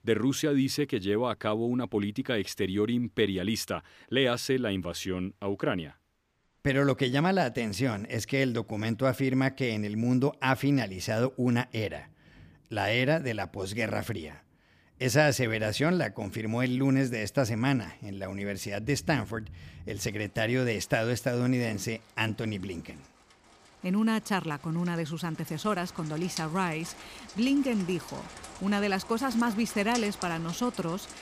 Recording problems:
rain or running water; noticeable; throughout; 15 dB below the speech

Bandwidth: 15 kHz